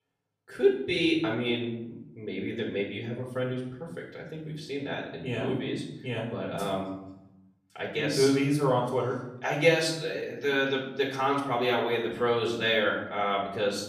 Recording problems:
off-mic speech; far
room echo; noticeable; dies away in 0.7 s

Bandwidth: 15 kHz